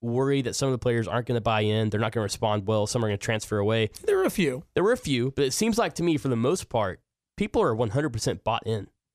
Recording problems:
none

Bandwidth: 14.5 kHz